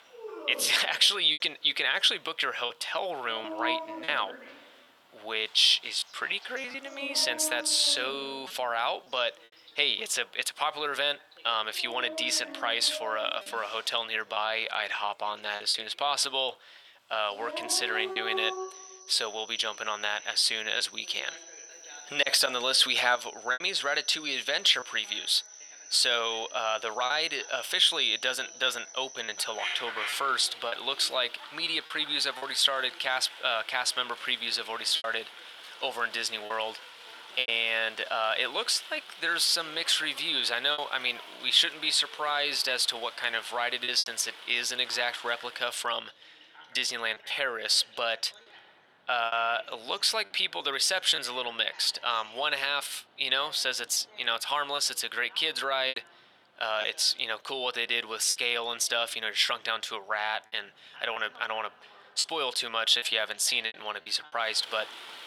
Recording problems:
thin; very; fading below 800 Hz
animal sounds; noticeable; throughout; 15 dB below the speech
voice in the background; faint; throughout; 25 dB below the speech
choppy; occasionally; 3% of the speech affected

